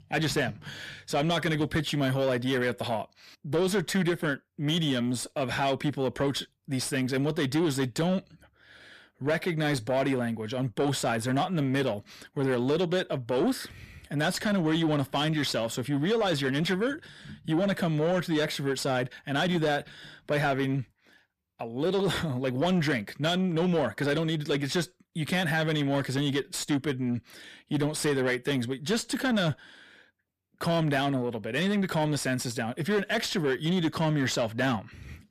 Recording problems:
distortion; slight; 10 dB below the speech

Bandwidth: 14.5 kHz